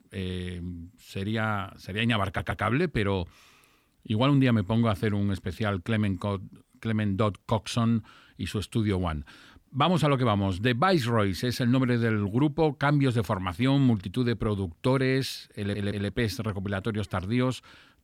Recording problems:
audio stuttering; at 2.5 s and at 16 s

